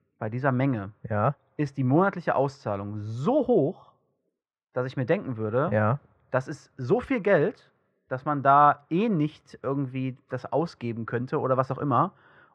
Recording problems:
muffled; very; fading above 2 kHz

